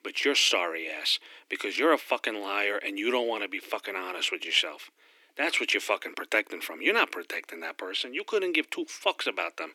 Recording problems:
thin; very; fading below 300 Hz

